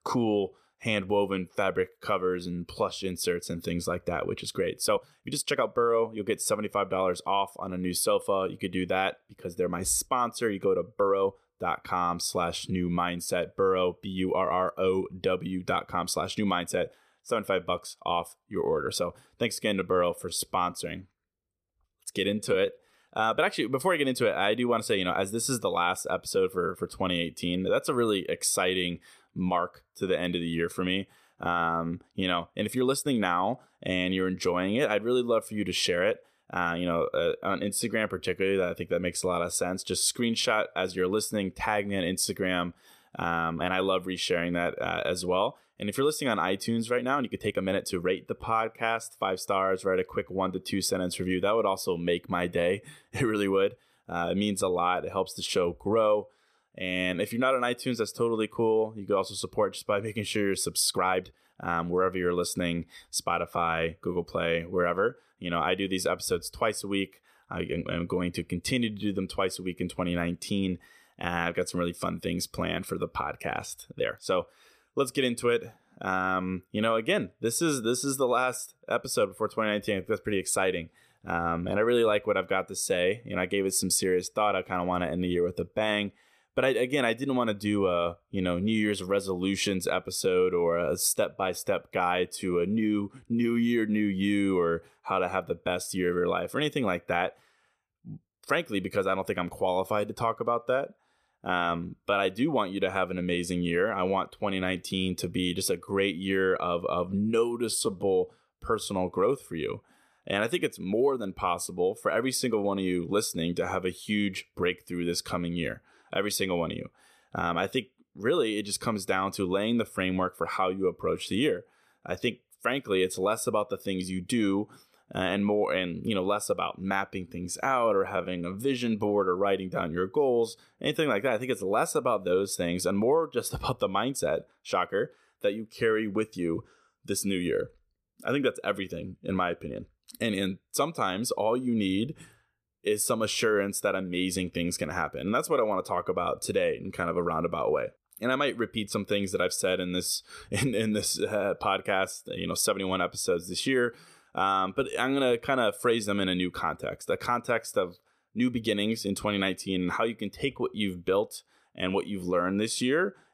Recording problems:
uneven, jittery; strongly; from 5 s to 2:08

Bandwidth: 14.5 kHz